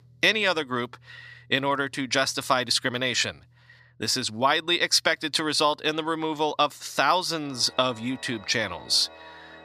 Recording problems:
thin; very slightly; fading below 300 Hz
background music; faint; throughout; 25 dB below the speech

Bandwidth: 14.5 kHz